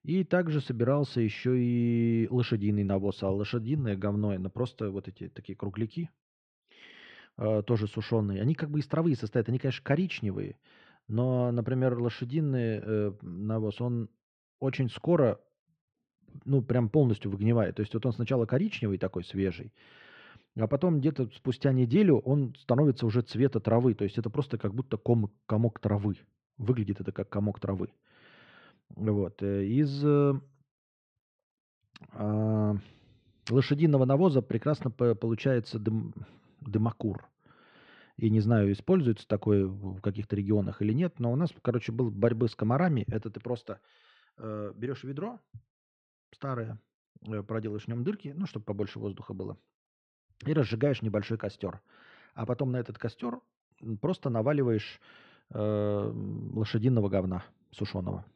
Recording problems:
muffled; slightly; fading above 3 kHz

